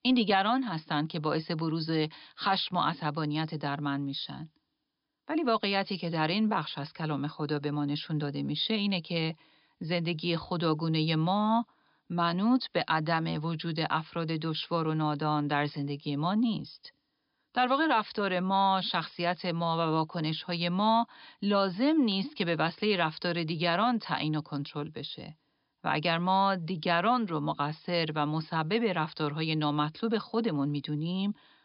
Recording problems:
high frequencies cut off; noticeable; nothing above 5.5 kHz

